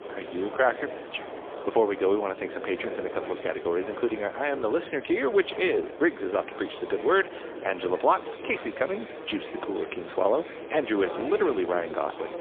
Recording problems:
phone-call audio; poor line; nothing above 3.5 kHz
murmuring crowd; noticeable; throughout; 10 dB below the speech
wind noise on the microphone; occasional gusts; 15 dB below the speech

